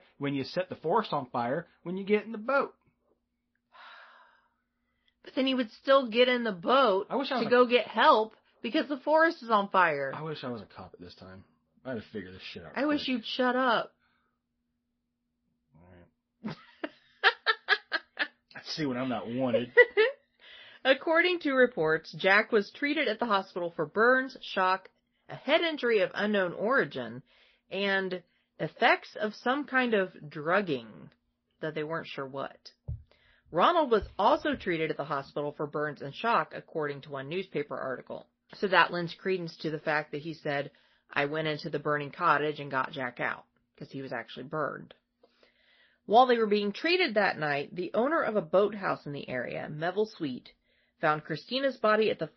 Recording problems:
garbled, watery; slightly; nothing above 5.5 kHz
high frequencies cut off; slight

